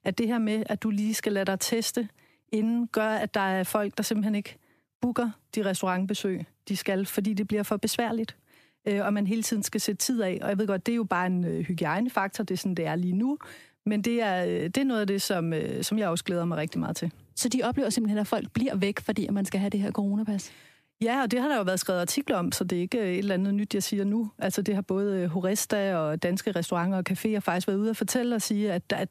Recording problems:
squashed, flat; heavily

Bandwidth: 14.5 kHz